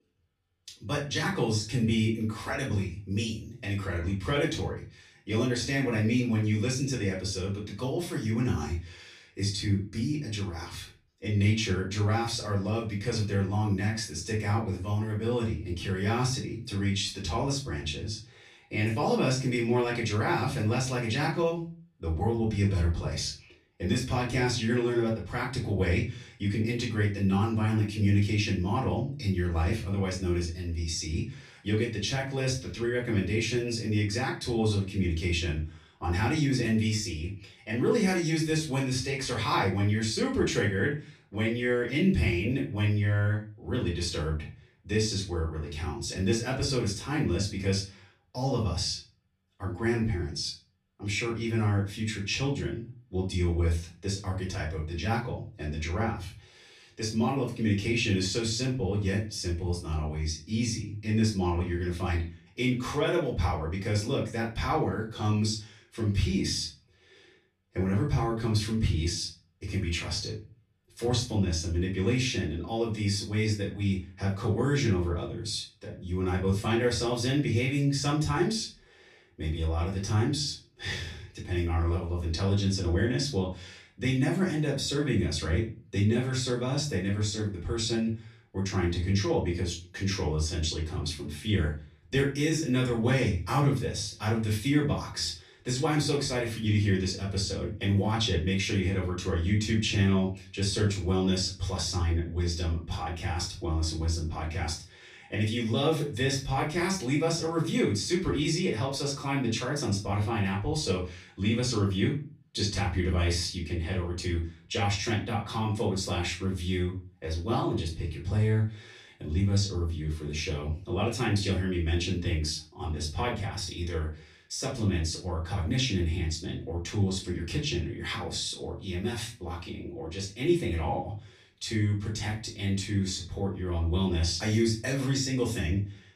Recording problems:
off-mic speech; far
room echo; slight; dies away in 0.3 s

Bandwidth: 14.5 kHz